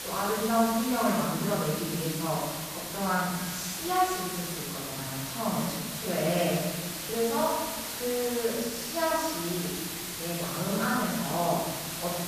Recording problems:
off-mic speech; far
room echo; noticeable; dies away in 1.5 s
hiss; loud; throughout; 4 dB below the speech

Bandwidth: 14.5 kHz